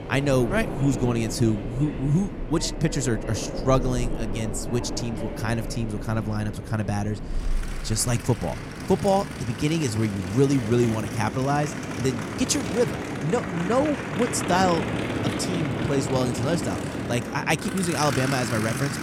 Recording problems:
train or aircraft noise; loud; throughout; 5 dB below the speech

